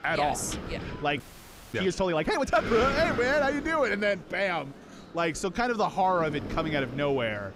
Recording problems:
wind noise on the microphone; occasional gusts; 10 dB below the speech
murmuring crowd; faint; throughout; 20 dB below the speech
audio freezing; at 1 s for 0.5 s

